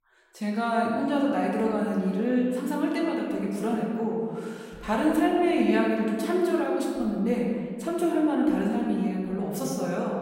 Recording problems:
off-mic speech; far
room echo; noticeable; dies away in 2.2 s

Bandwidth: 16 kHz